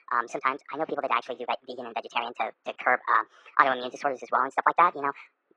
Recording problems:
muffled; very; fading above 2 kHz
thin; very; fading below 450 Hz
wrong speed and pitch; too fast and too high; 1.5 times normal speed
garbled, watery; slightly

